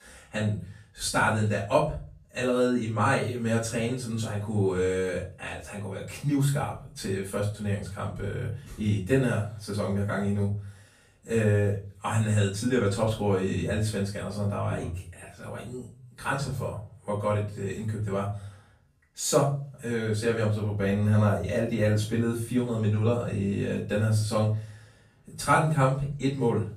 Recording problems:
off-mic speech; far
room echo; noticeable; dies away in 0.4 s

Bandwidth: 14.5 kHz